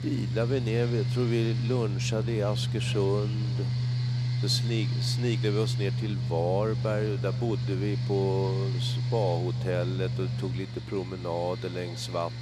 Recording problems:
echo of what is said; faint; throughout; 400 ms later, 25 dB below the speech
machinery noise; very loud; throughout; 1 dB above the speech

